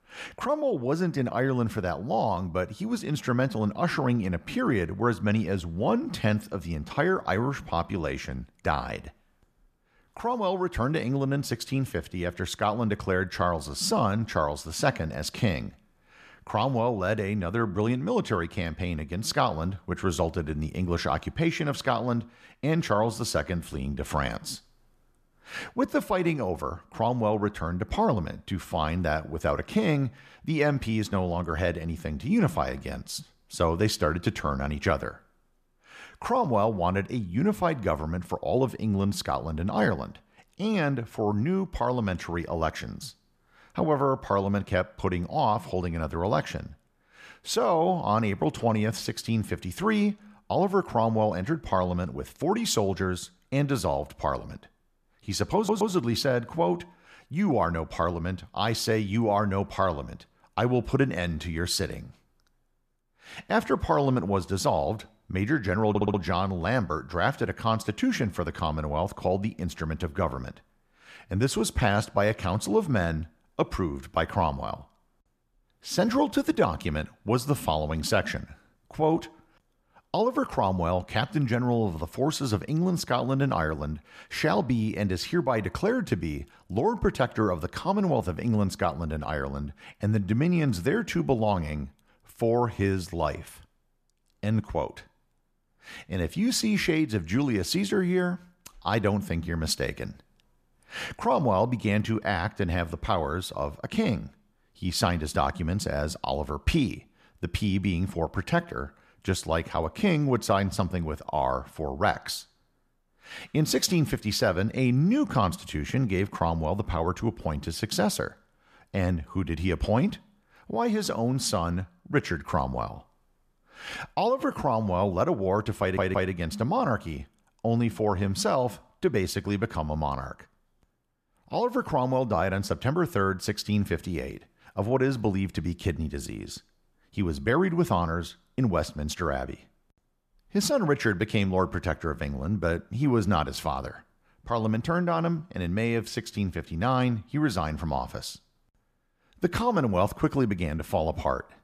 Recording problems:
audio stuttering; at 56 s, at 1:06 and at 2:06

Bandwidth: 14.5 kHz